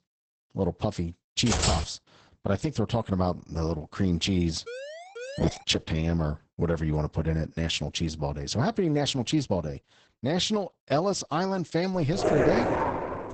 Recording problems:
garbled, watery; badly; nothing above 8 kHz
keyboard typing; loud; at 1.5 s; peak 2 dB above the speech
siren; faint; at 4.5 s; peak 10 dB below the speech
dog barking; loud; from 12 s on; peak 4 dB above the speech

